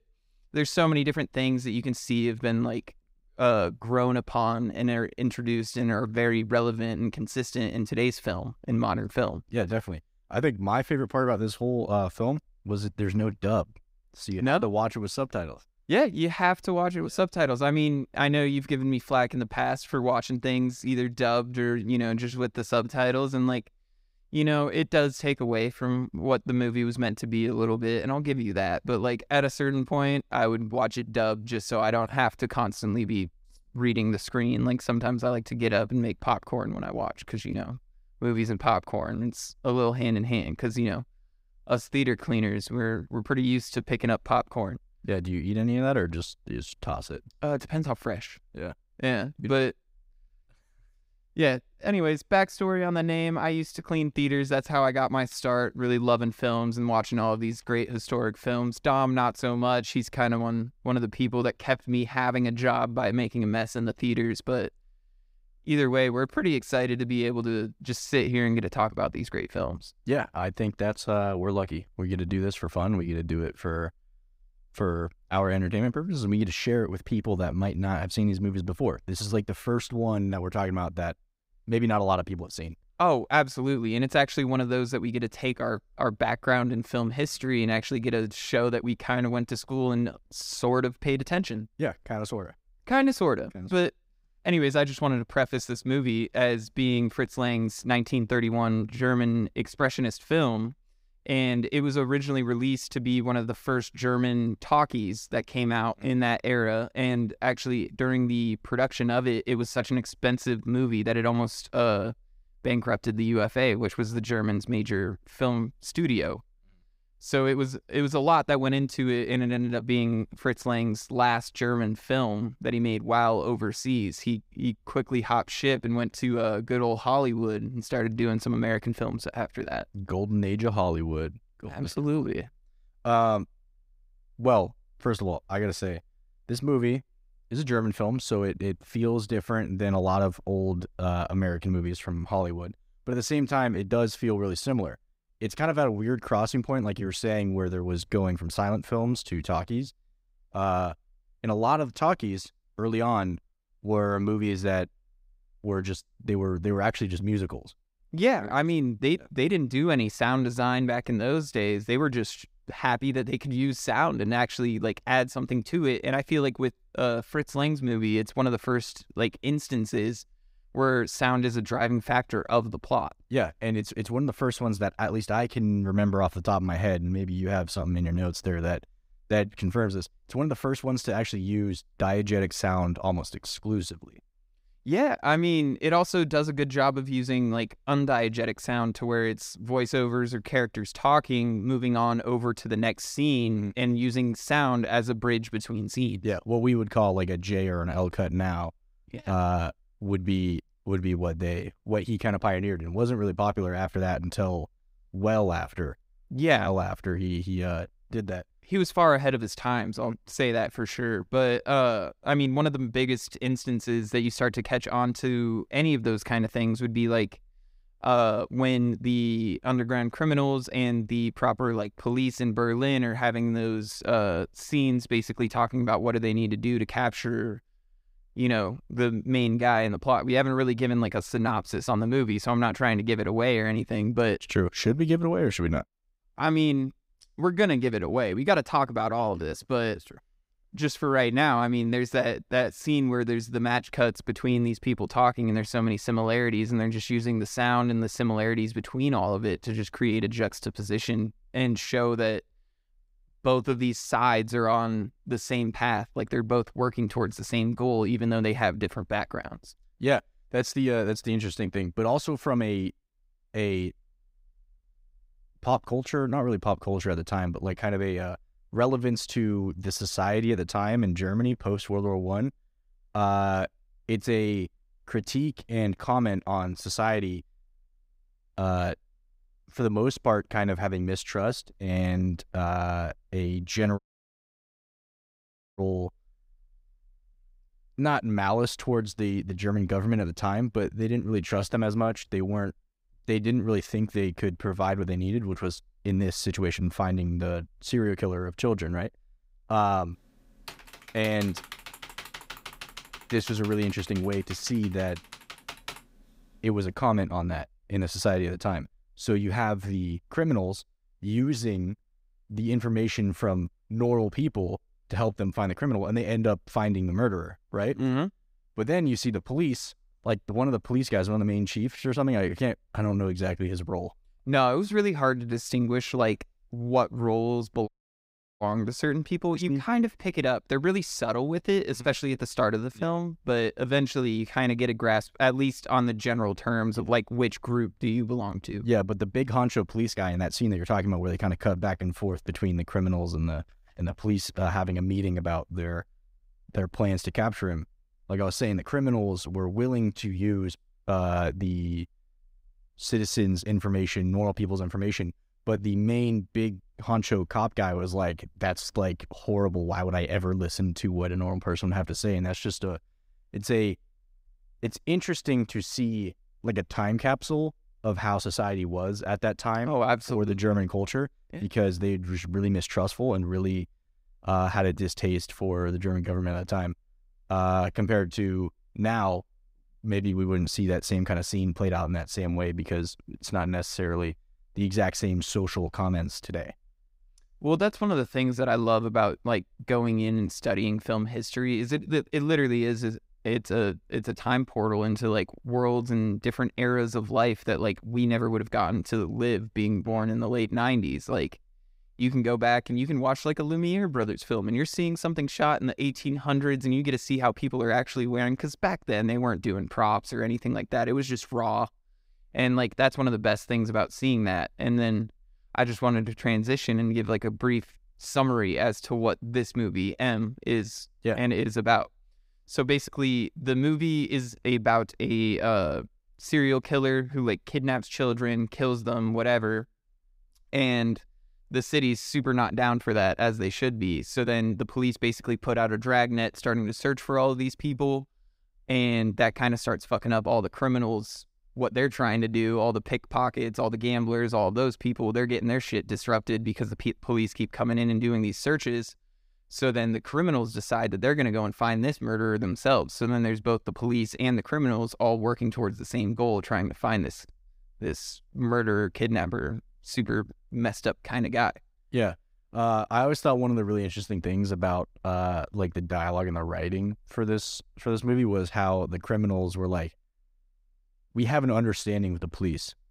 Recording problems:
audio cutting out; at 4:44 for 2 s and at 5:28 for 0.5 s
keyboard typing; faint; from 5:01 to 5:06; peak 10 dB below the speech

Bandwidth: 15.5 kHz